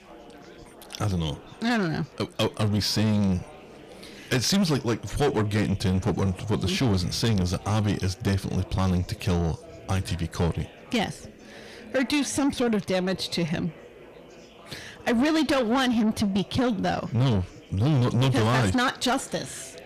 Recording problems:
distortion; heavy; 7 dB below the speech
chatter from many people; faint; throughout; 20 dB below the speech

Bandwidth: 14.5 kHz